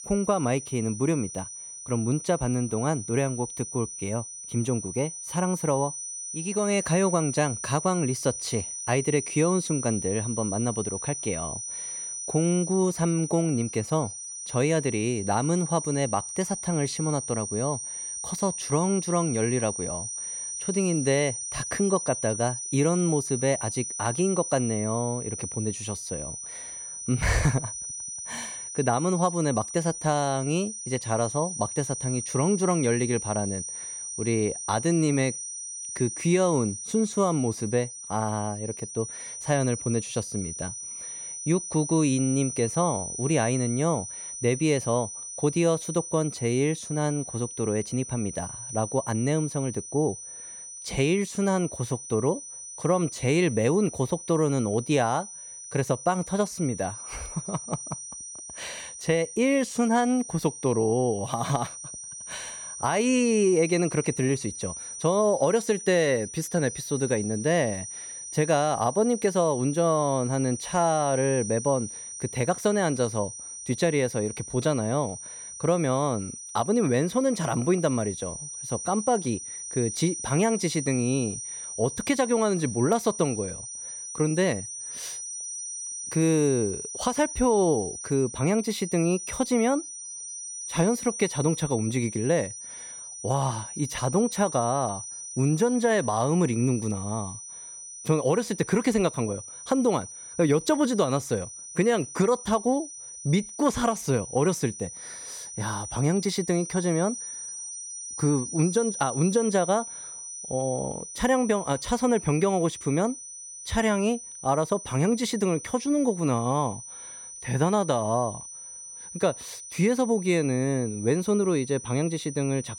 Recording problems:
high-pitched whine; loud; throughout; 6 kHz, 8 dB below the speech

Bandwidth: 17 kHz